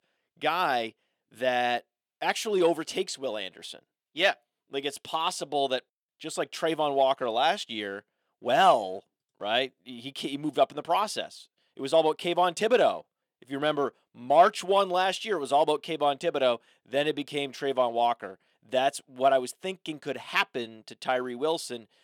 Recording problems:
thin; somewhat; fading below 300 Hz

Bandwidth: 18.5 kHz